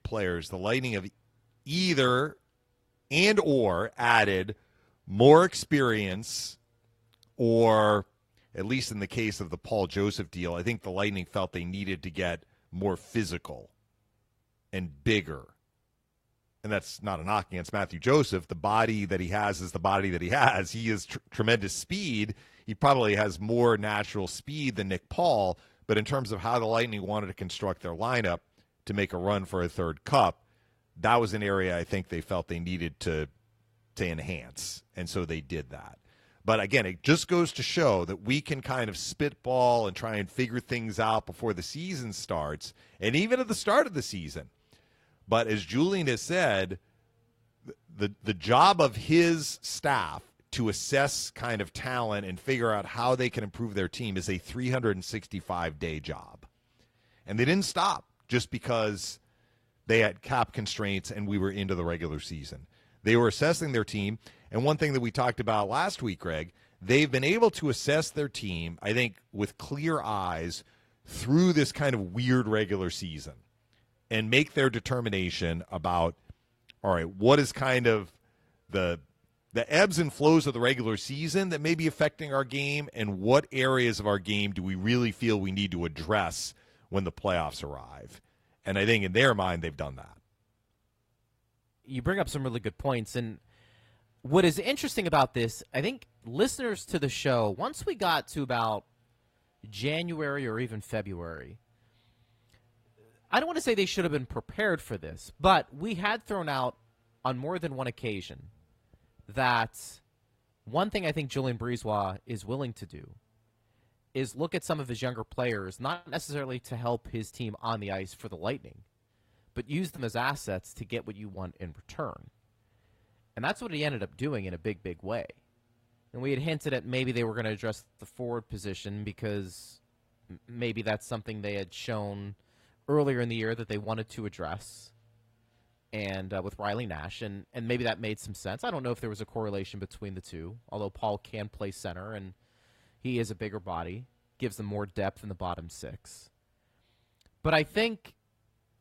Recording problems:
garbled, watery; slightly

